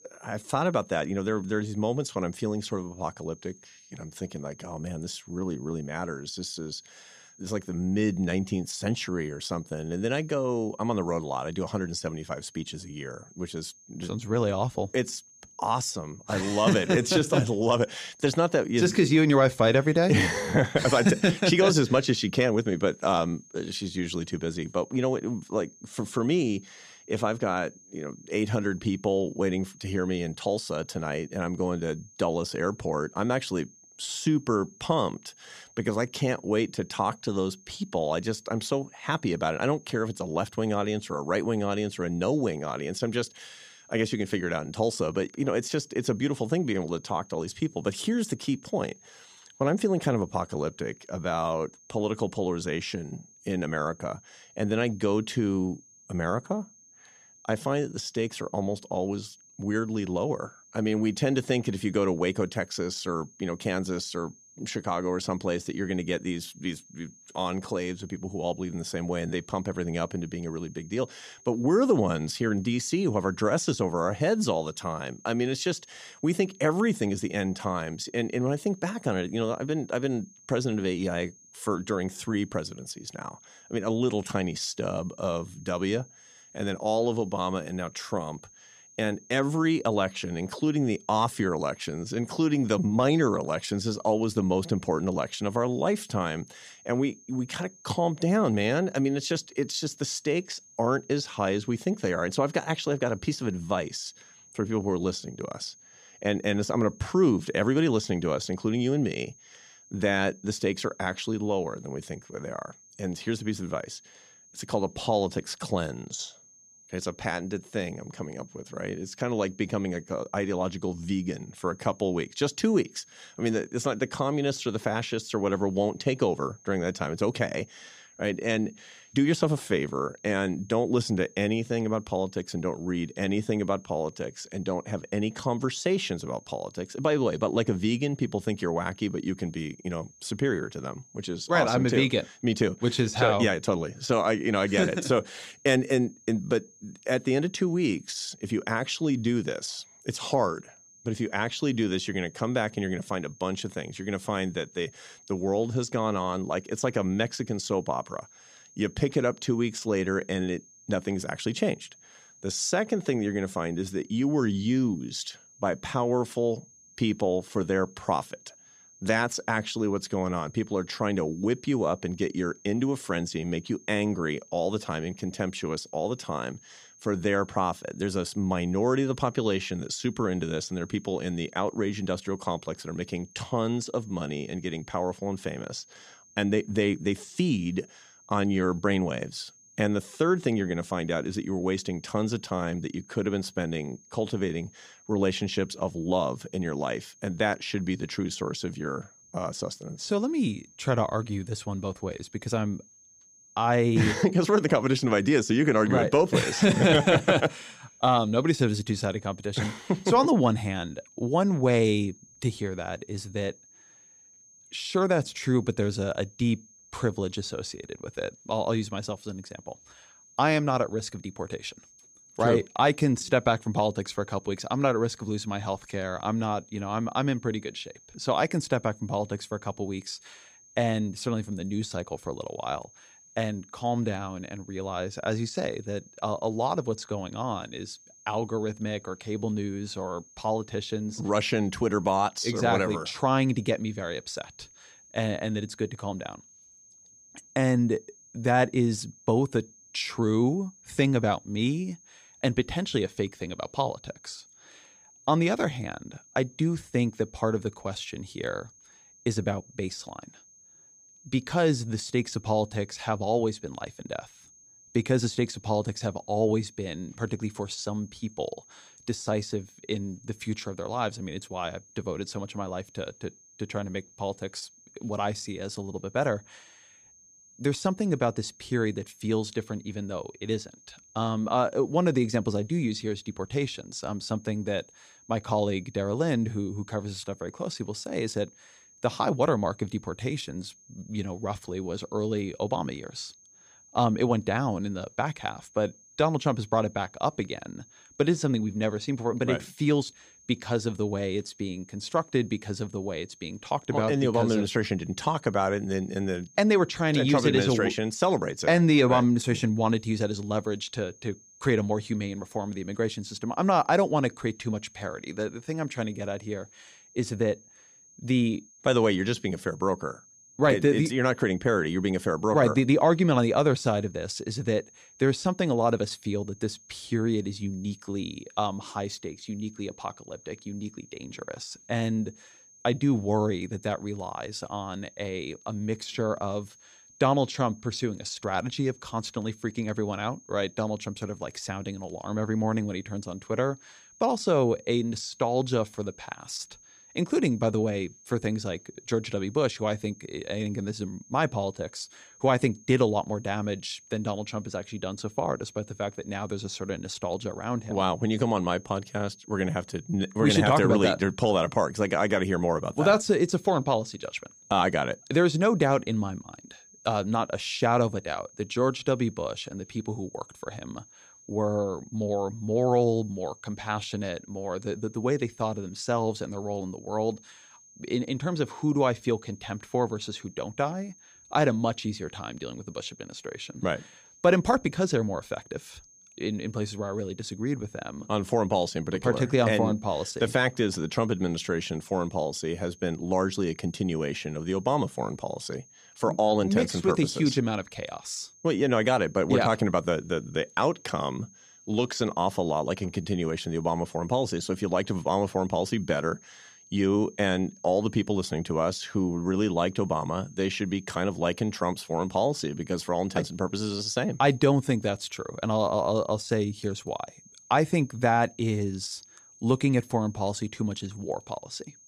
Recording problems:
high-pitched whine; faint; throughout; 6.5 kHz, 25 dB below the speech

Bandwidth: 15 kHz